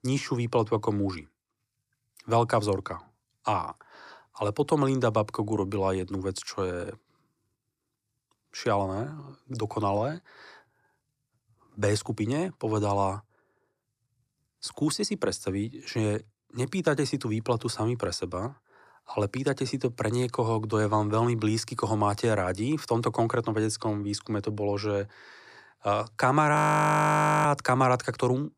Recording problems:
audio freezing; at 27 s for 1 s

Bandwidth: 14.5 kHz